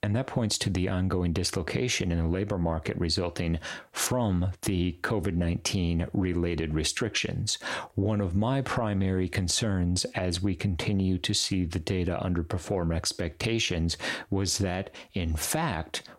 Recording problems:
squashed, flat; heavily

